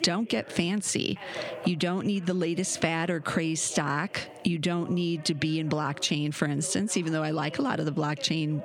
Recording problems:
squashed, flat; somewhat, background pumping
voice in the background; noticeable; throughout; 20 dB below the speech

